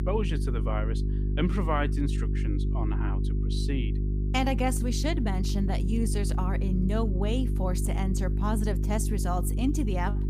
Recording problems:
electrical hum; loud; throughout; 50 Hz, 8 dB below the speech

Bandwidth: 15 kHz